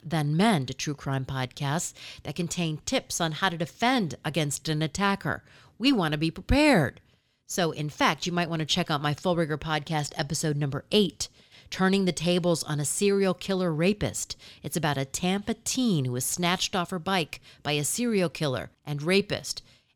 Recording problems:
none

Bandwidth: 18.5 kHz